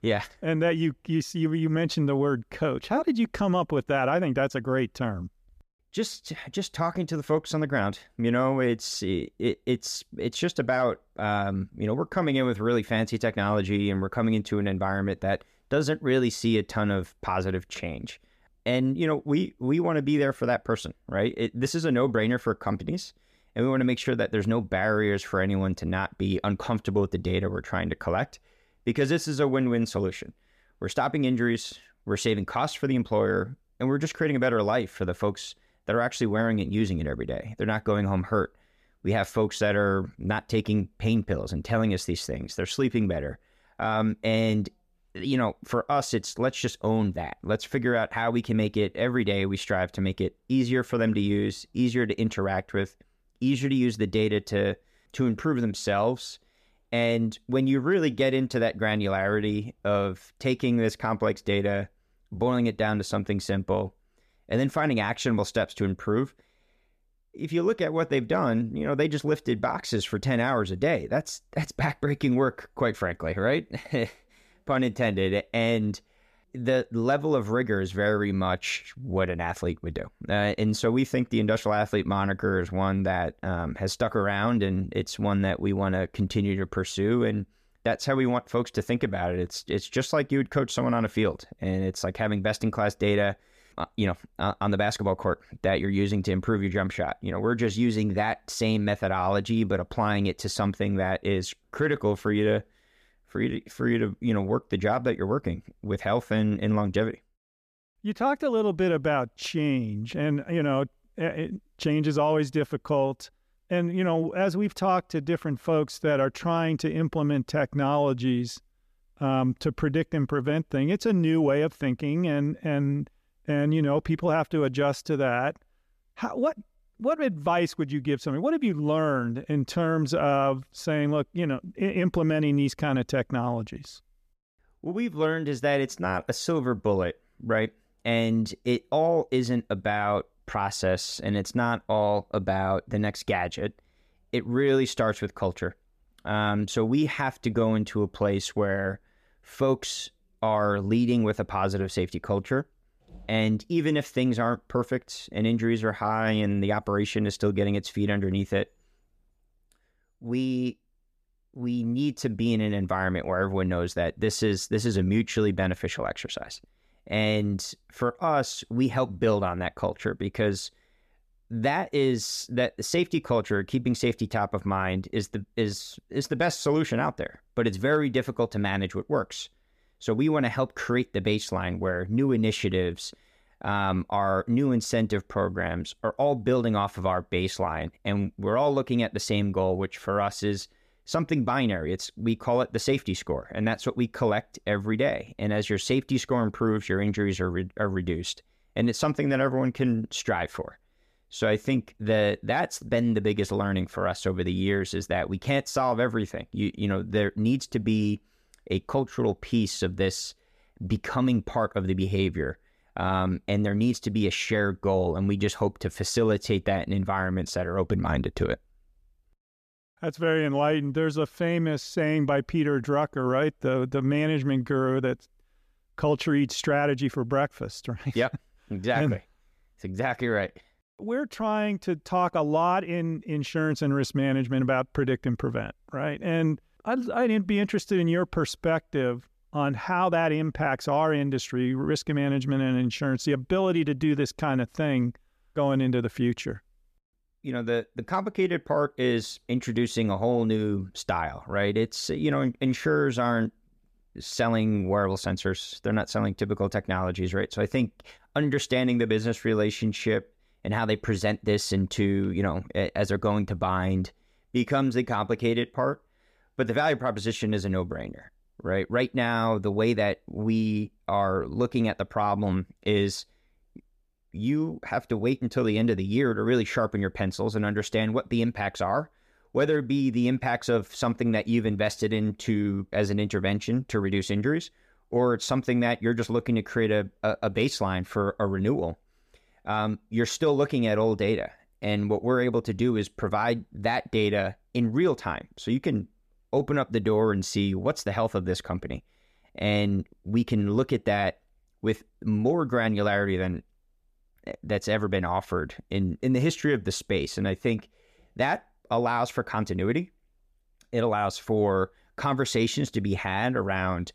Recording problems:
none

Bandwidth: 14.5 kHz